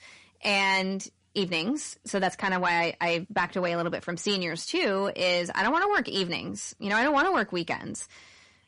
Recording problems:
distortion; slight; 10 dB below the speech
garbled, watery; slightly; nothing above 10.5 kHz

